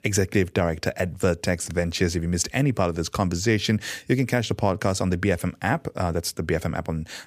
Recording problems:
none

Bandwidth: 15 kHz